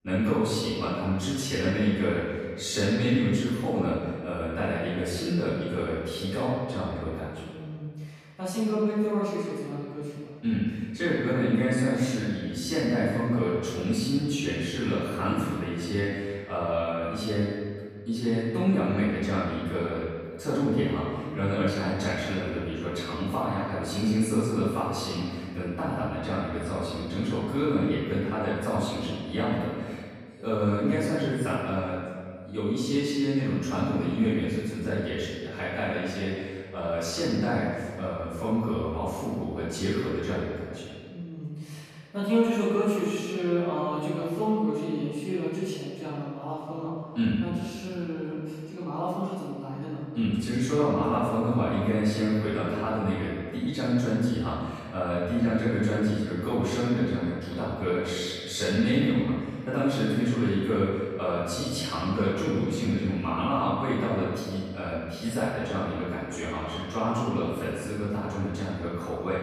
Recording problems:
room echo; strong; dies away in 1.7 s
off-mic speech; far

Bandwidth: 14 kHz